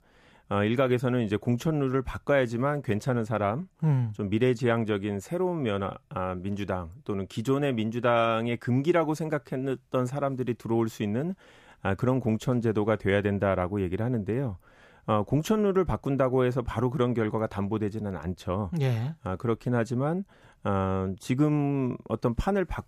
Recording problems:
none

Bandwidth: 14.5 kHz